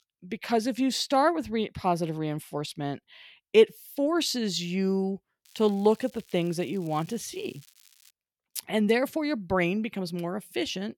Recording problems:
crackling; faint; from 5.5 to 8 s; 30 dB below the speech

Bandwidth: 17.5 kHz